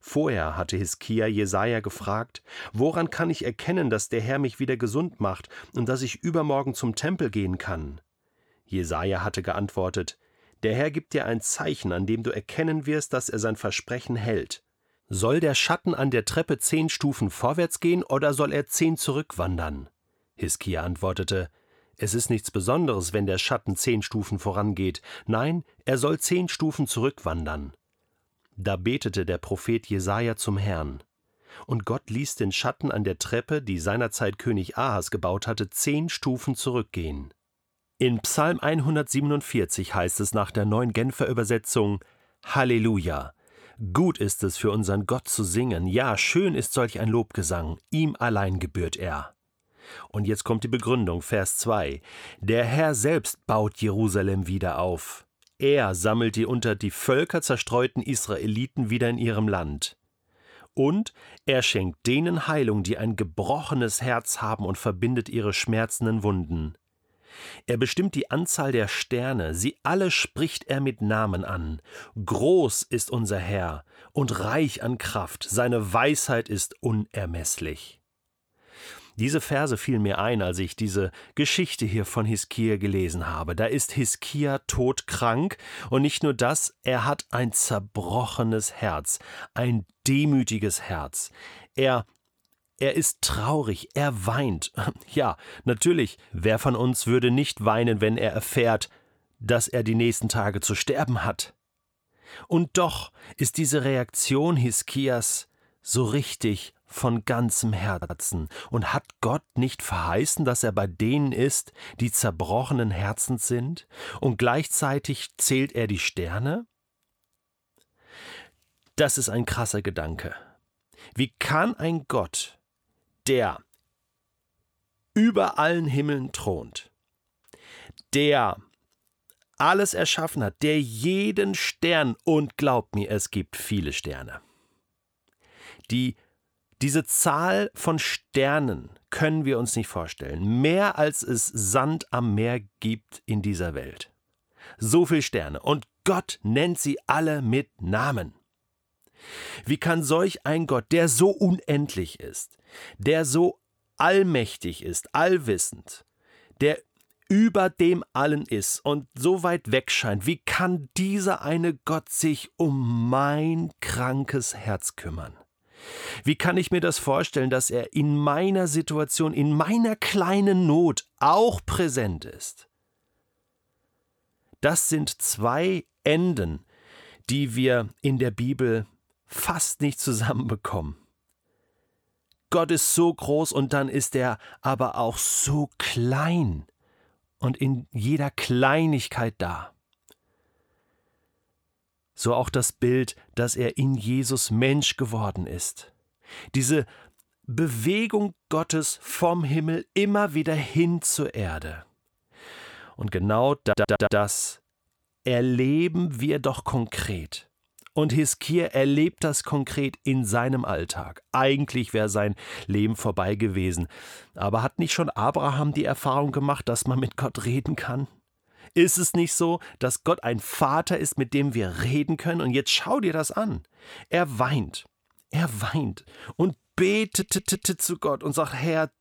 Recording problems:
audio stuttering; at 1:48, at 3:24 and at 3:47

